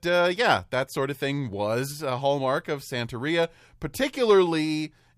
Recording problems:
none

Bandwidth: 15 kHz